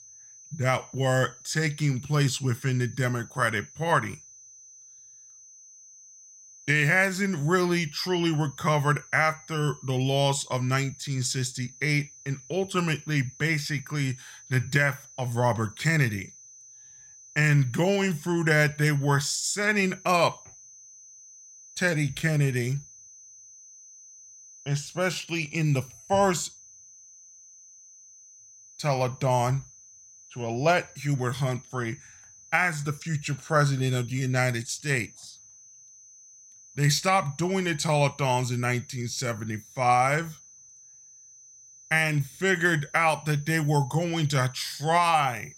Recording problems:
high-pitched whine; faint; throughout; 6 kHz, 20 dB below the speech

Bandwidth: 16 kHz